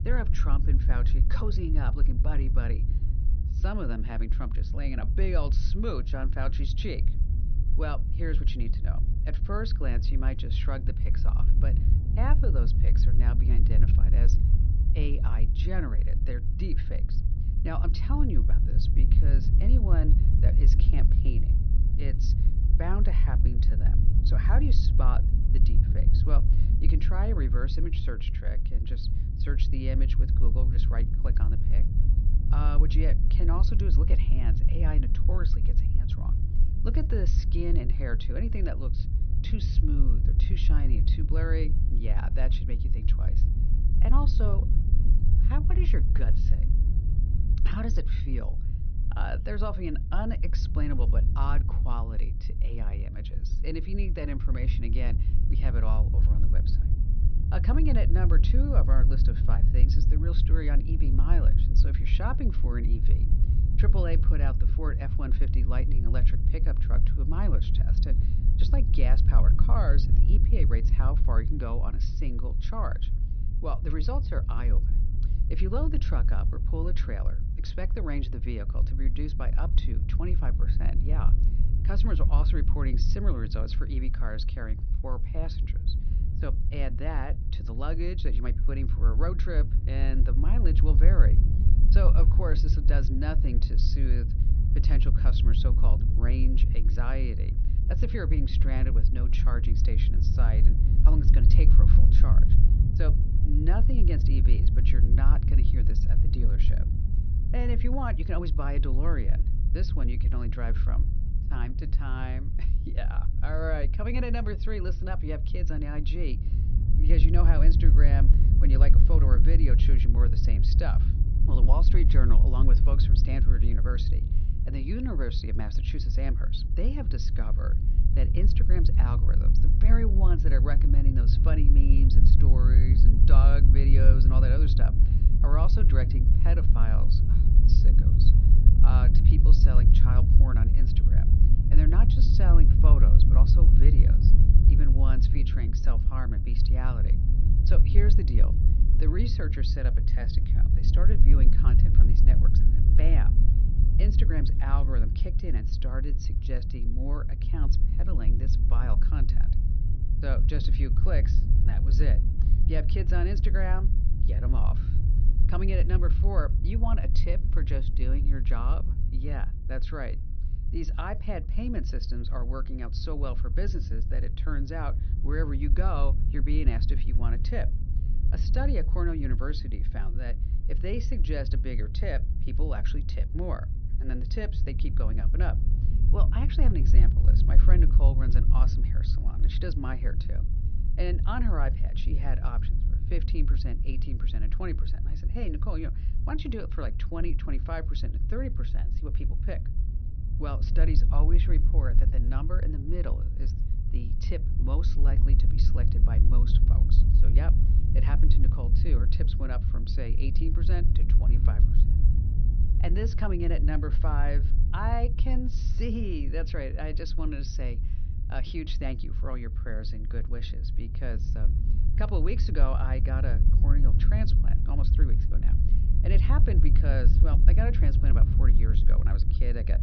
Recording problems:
high frequencies cut off; noticeable; nothing above 6 kHz
low rumble; loud; throughout; 5 dB below the speech

